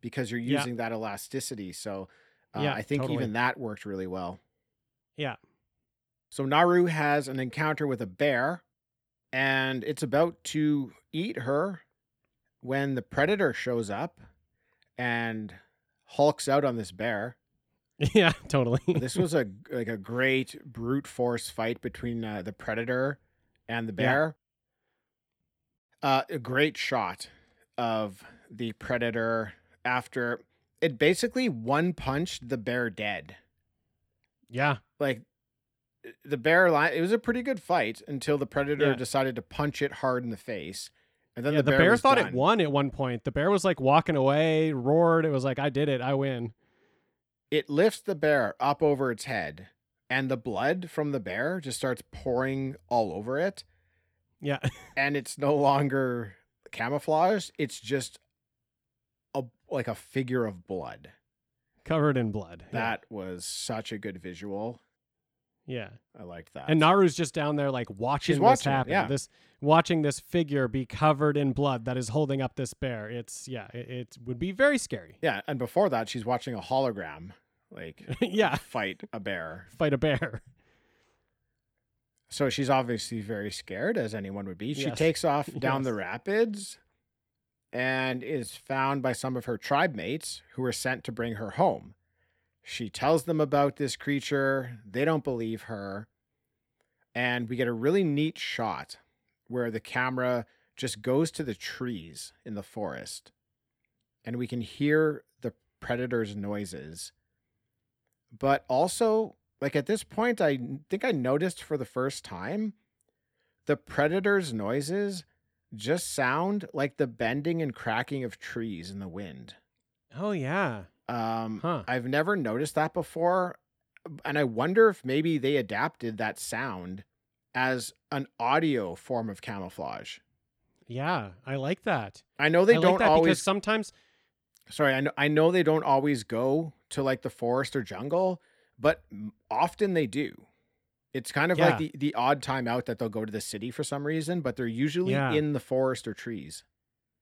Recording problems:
uneven, jittery; strongly; from 1:23 to 1:29

